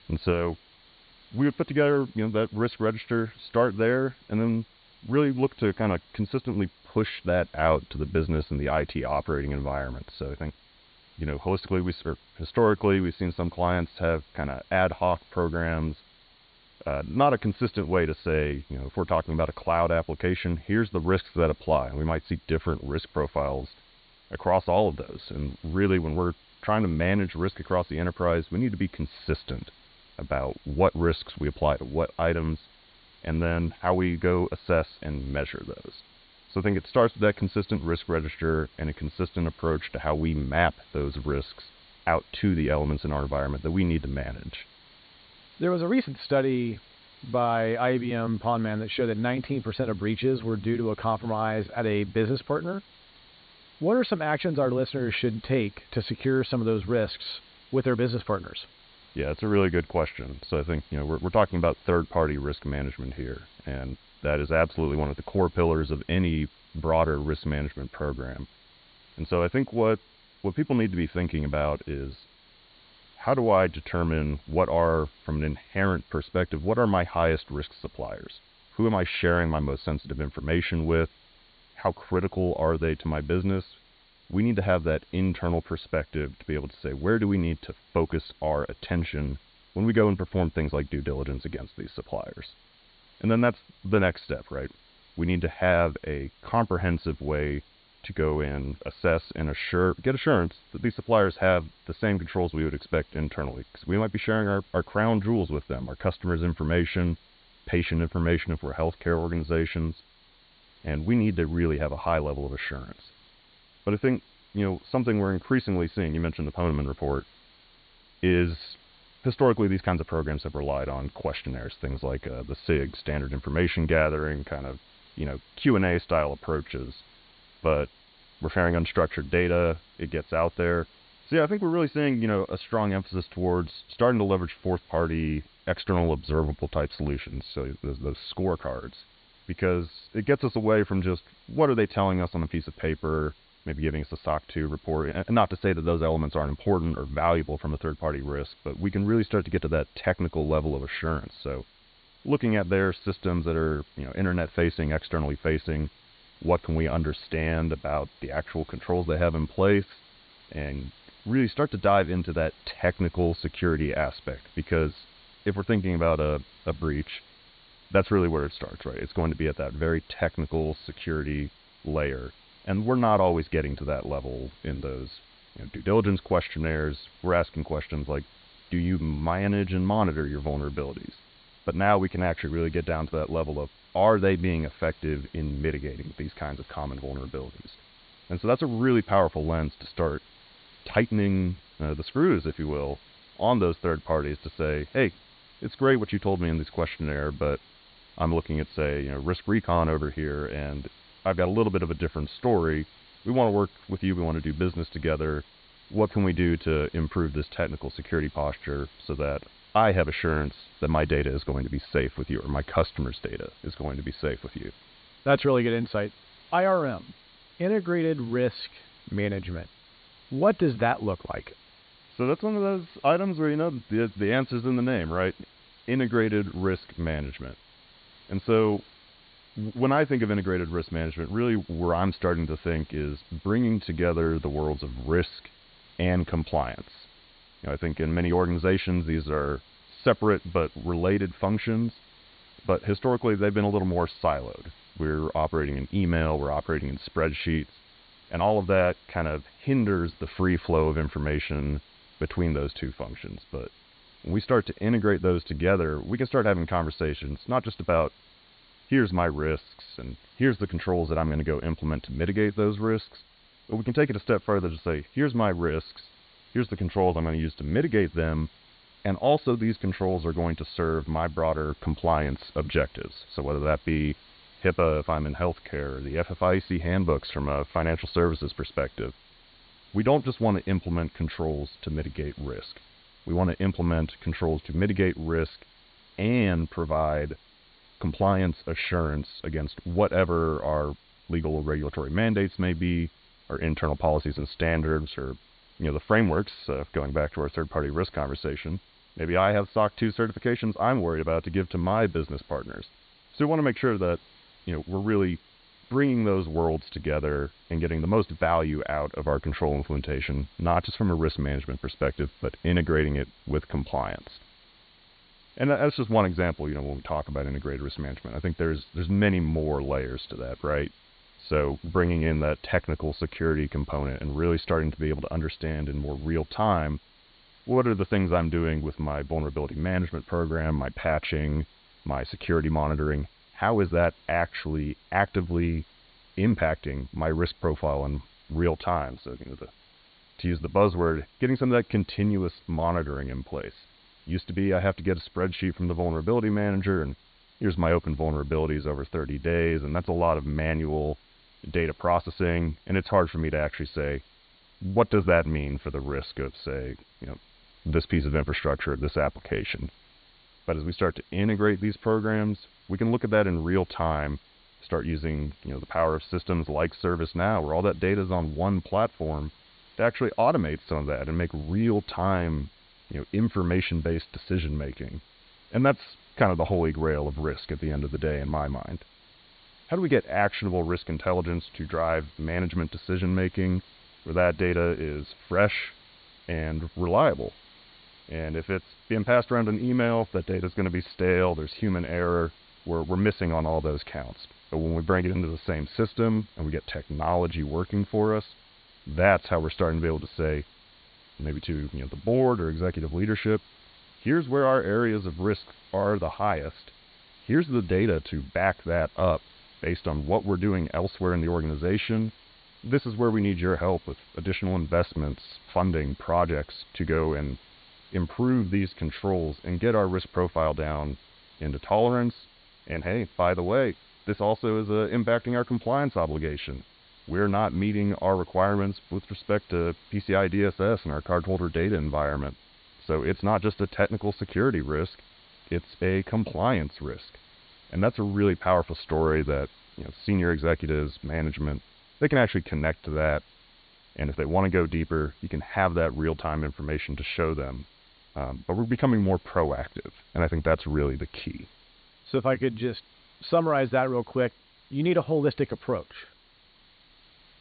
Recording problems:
high frequencies cut off; severe; nothing above 4.5 kHz
hiss; faint; throughout; 25 dB below the speech

